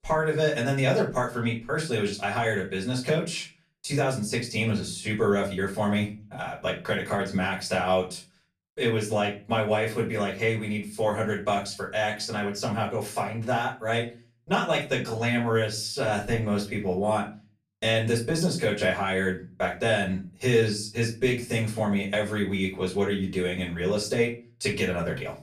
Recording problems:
off-mic speech; far
room echo; slight; dies away in 0.3 s

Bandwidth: 14.5 kHz